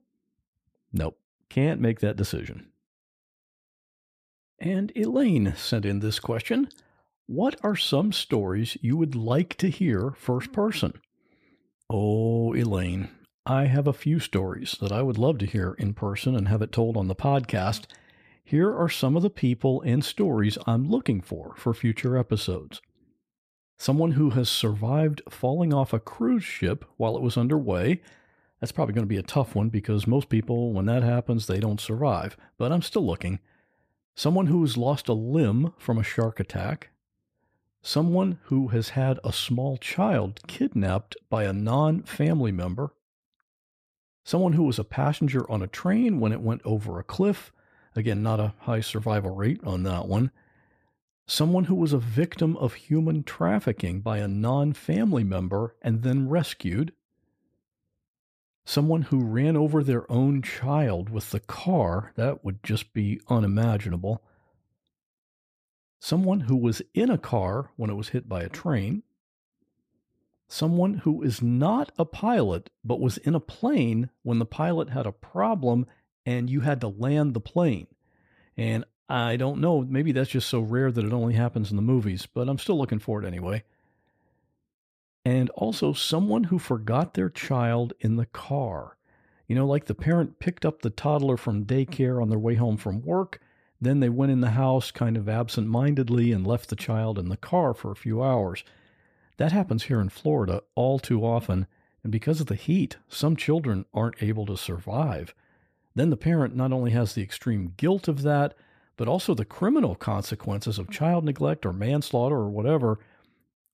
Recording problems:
none

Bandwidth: 15 kHz